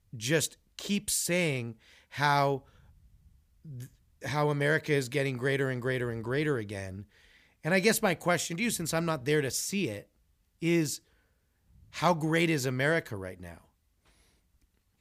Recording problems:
none

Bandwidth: 15 kHz